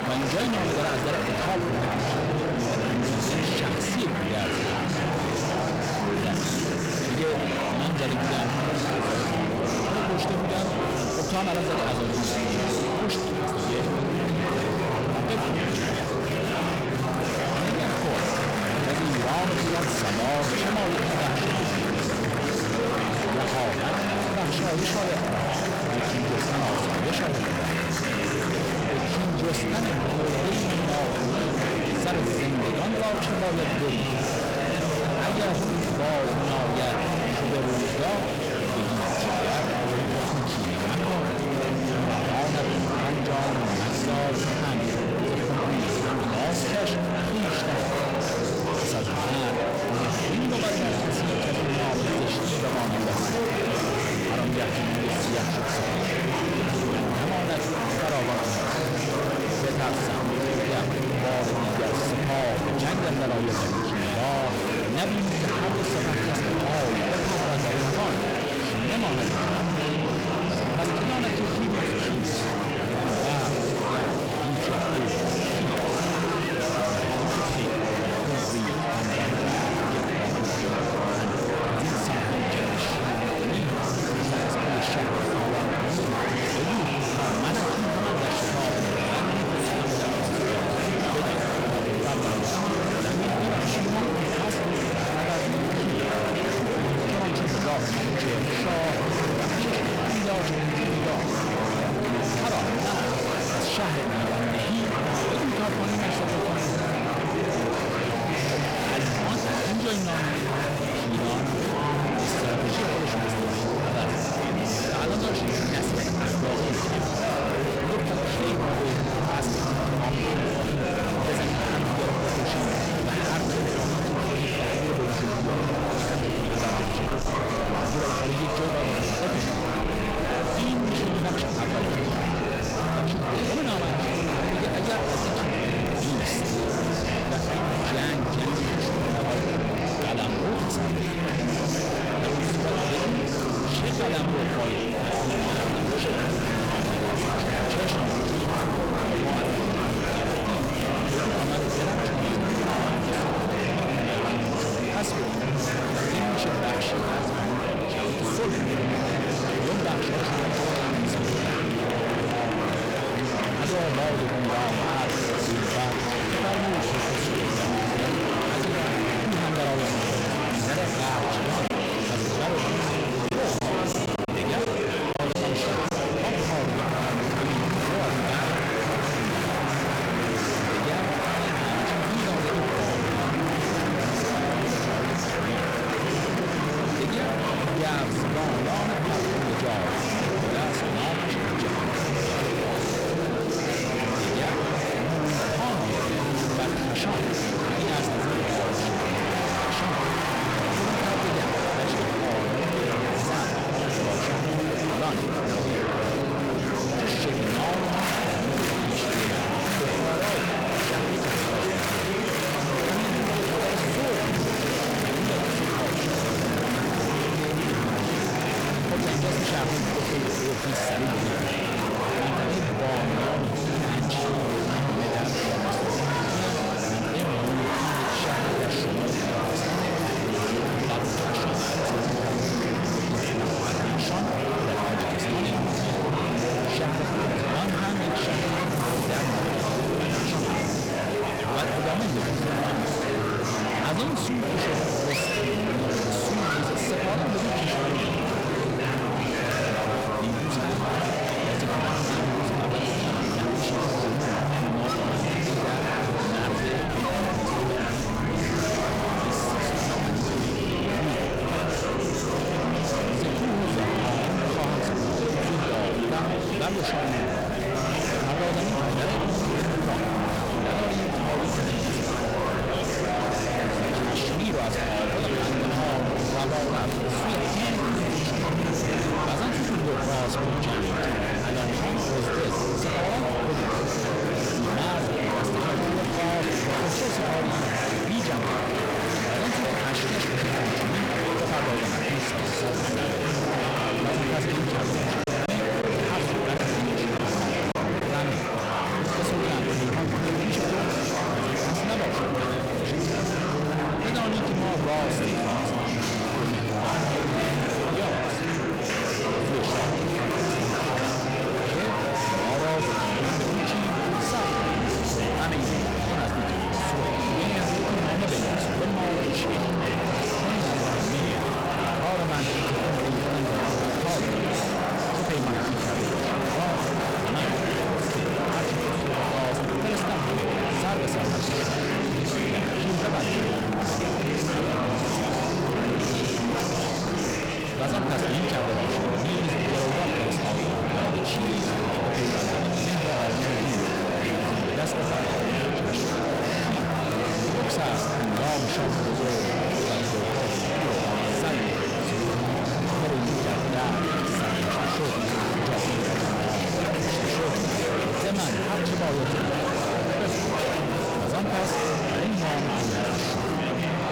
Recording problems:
distortion; heavy; 8 dB below the speech
murmuring crowd; very loud; throughout; 3 dB above the speech
background music; noticeable; throughout; 20 dB below the speech
crackle, like an old record; faint; 25 dB below the speech
choppy; occasionally; from 2:52 to 2:56 and from 4:55 to 4:58; 4% of the speech affected

